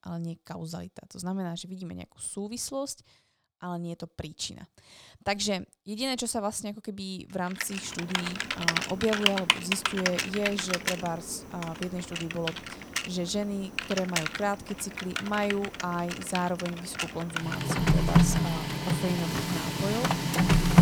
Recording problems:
household noises; very loud; from 8 s on; 4 dB above the speech

